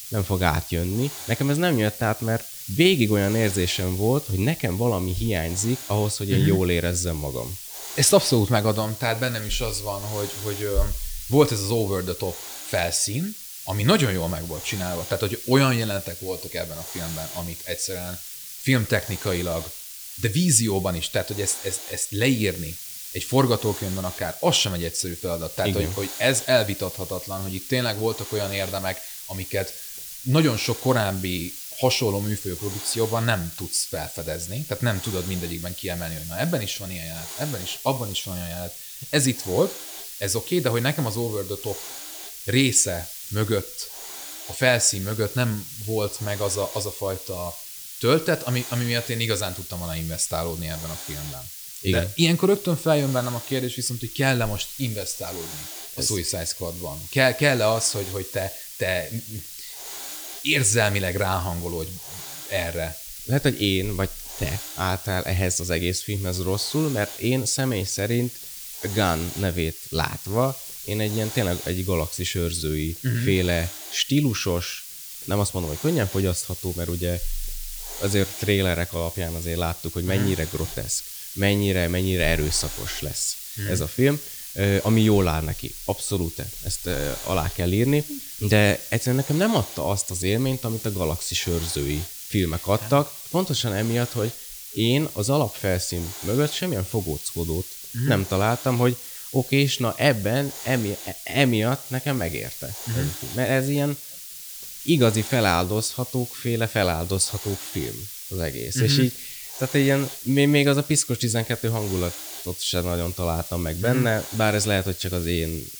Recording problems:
hiss; loud; throughout; 9 dB below the speech

